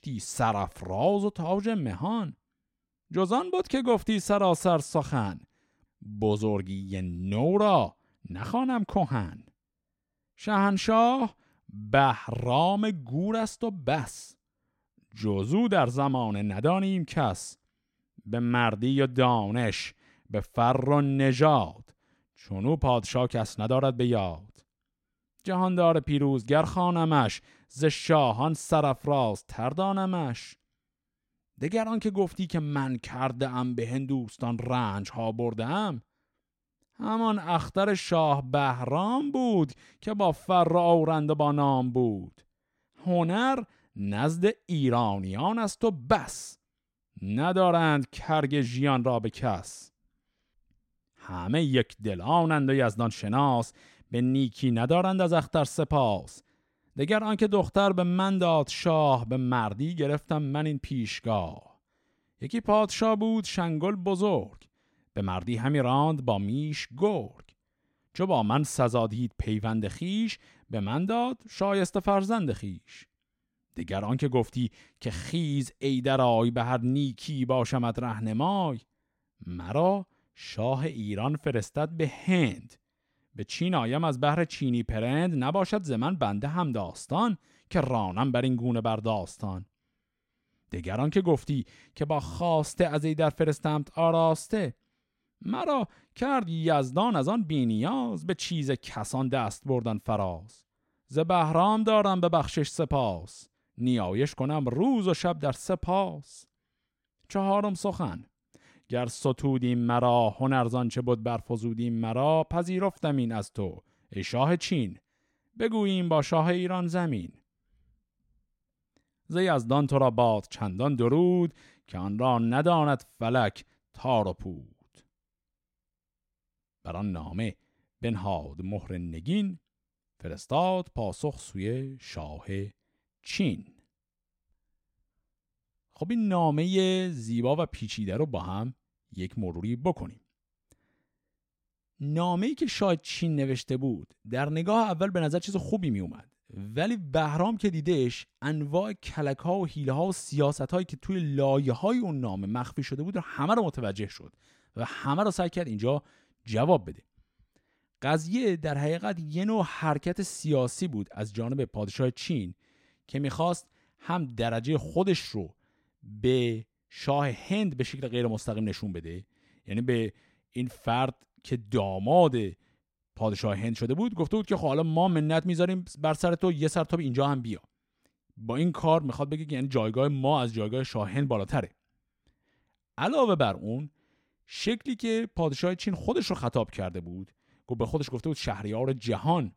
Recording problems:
none

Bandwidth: 16 kHz